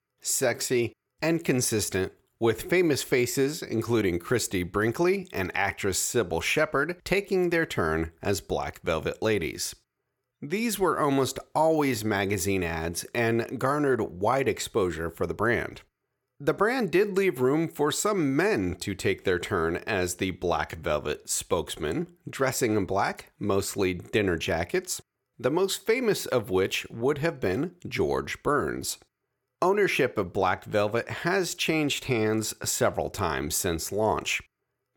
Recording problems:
none

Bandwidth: 17.5 kHz